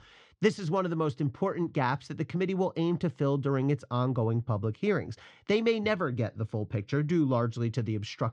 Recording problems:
muffled; slightly; fading above 4.5 kHz

